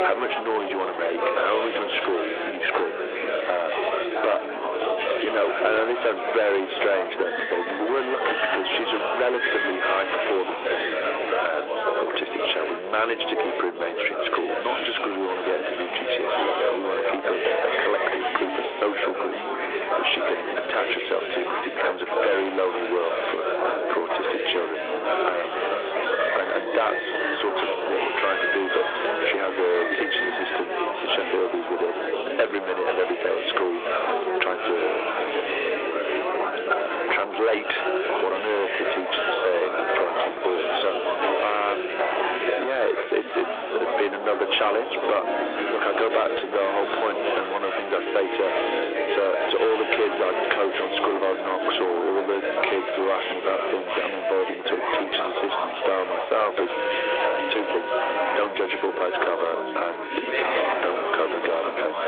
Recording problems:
distortion; heavy; 10% of the sound clipped
phone-call audio; nothing above 3.5 kHz
squashed, flat; somewhat
background music; loud; throughout; 8 dB below the speech
chatter from many people; loud; throughout; 1 dB below the speech

